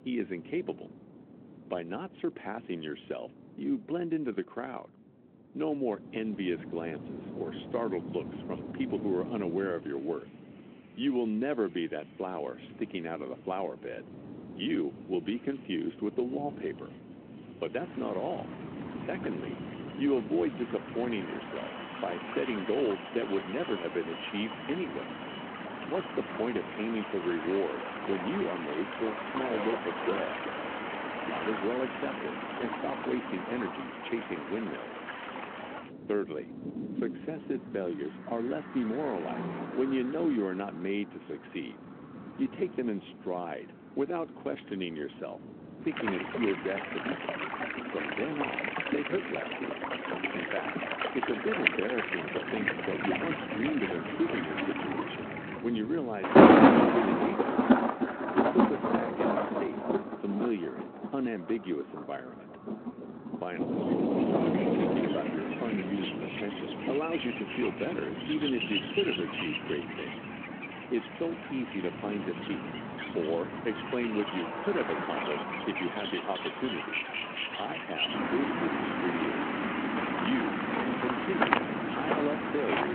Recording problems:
phone-call audio
rain or running water; very loud; from 18 s on; 3 dB above the speech
traffic noise; noticeable; throughout; 15 dB below the speech
wind noise on the microphone; occasional gusts; 15 dB below the speech
abrupt cut into speech; at the end

